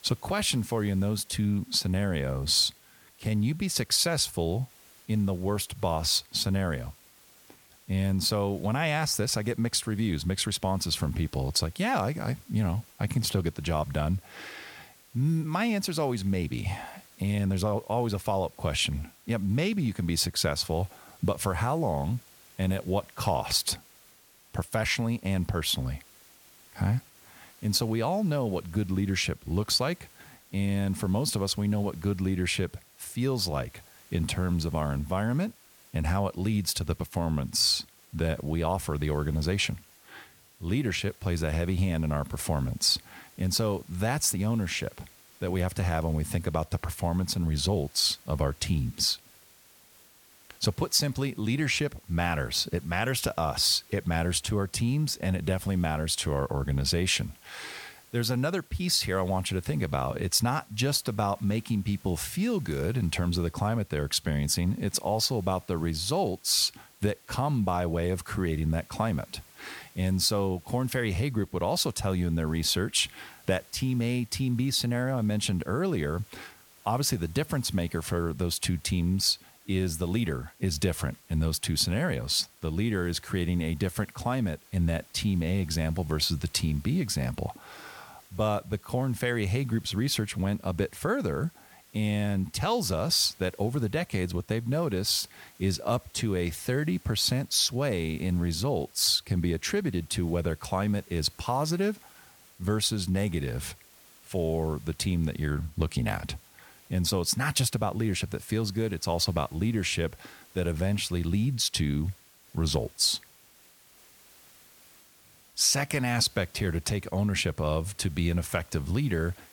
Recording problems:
hiss; faint; throughout; 25 dB below the speech

